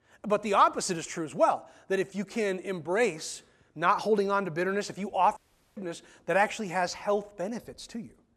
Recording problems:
audio cutting out; at 5.5 s

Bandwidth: 13.5 kHz